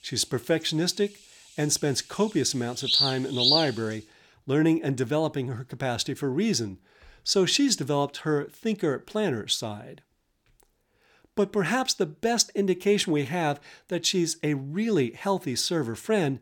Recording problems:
animal sounds; very loud; until 4 s; 3 dB above the speech

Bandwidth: 17.5 kHz